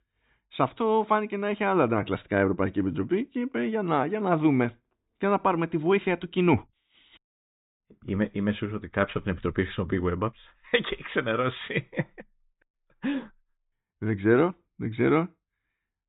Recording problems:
high frequencies cut off; severe; nothing above 4 kHz

